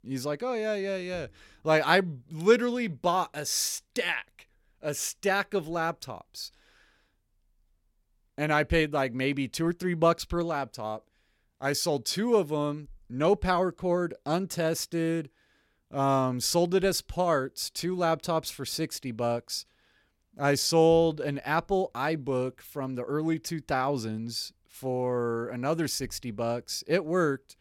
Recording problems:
none

